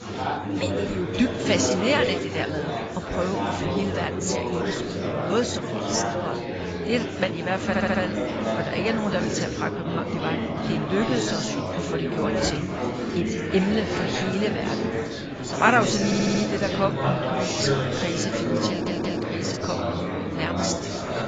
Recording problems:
garbled, watery; badly; nothing above 7.5 kHz
chatter from many people; very loud; throughout; as loud as the speech
household noises; noticeable; throughout; 15 dB below the speech
audio stuttering; at 7.5 s, at 16 s and at 19 s

